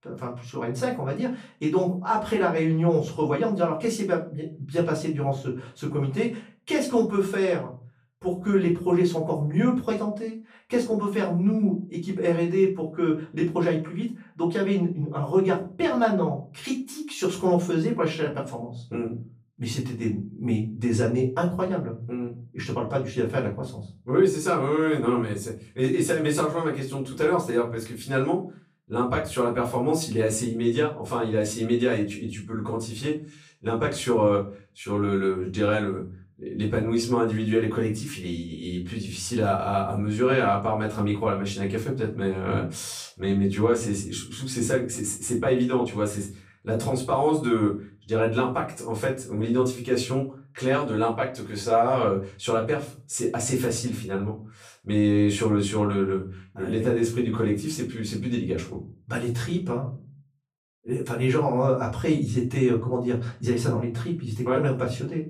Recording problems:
off-mic speech; far
room echo; slight; dies away in 0.3 s

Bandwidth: 15.5 kHz